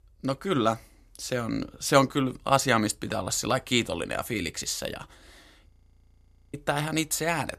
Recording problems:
audio freezing; at 5.5 s for 1 s

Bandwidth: 14.5 kHz